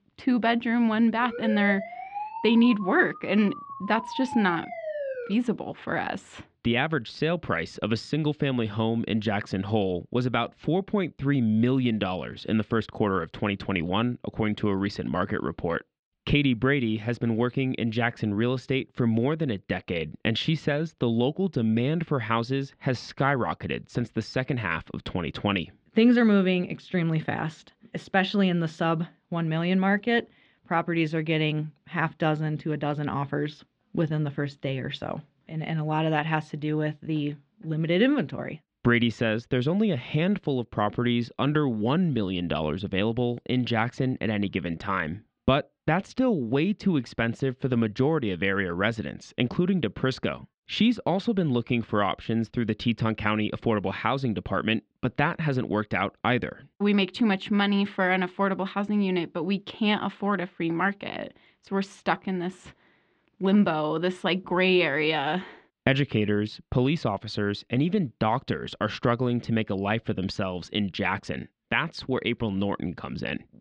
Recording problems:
muffled; slightly; fading above 4 kHz
siren; noticeable; from 1 to 5.5 s; peak 6 dB below the speech

